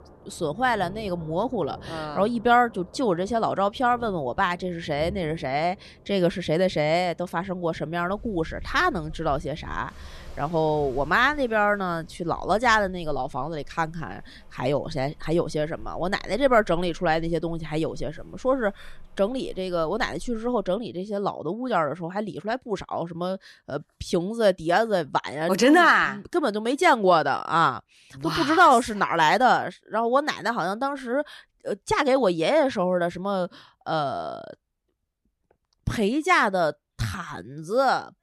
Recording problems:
rain or running water; faint; until 21 s; 25 dB below the speech

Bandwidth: 13.5 kHz